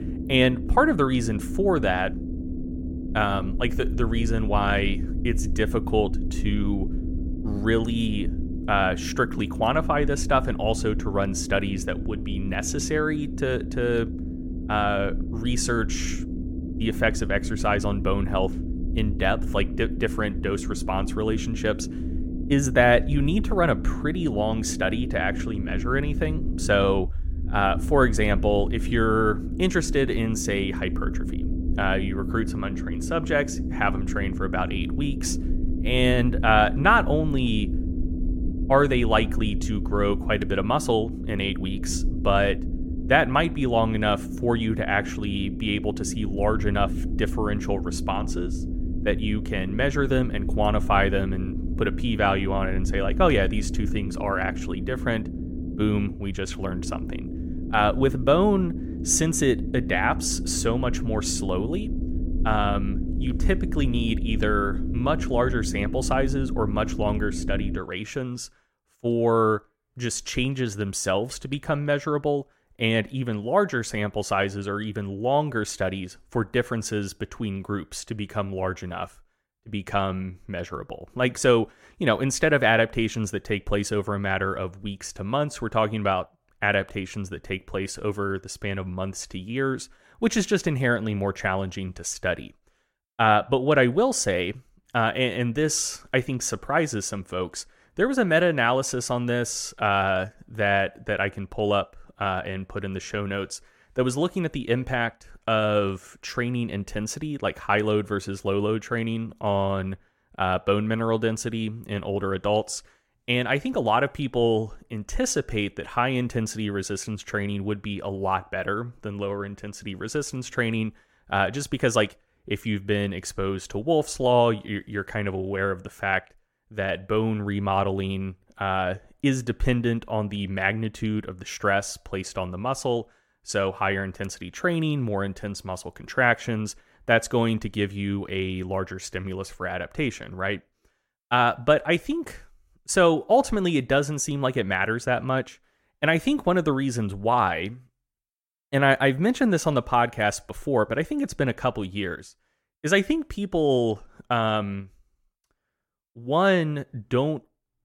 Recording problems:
low rumble; noticeable; until 1:08; 15 dB below the speech

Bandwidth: 16.5 kHz